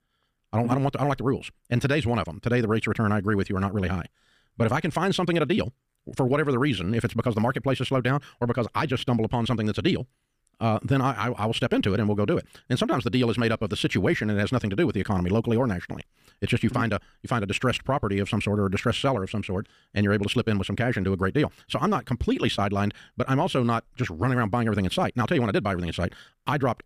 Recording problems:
wrong speed, natural pitch; too fast; 1.6 times normal speed

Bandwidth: 15 kHz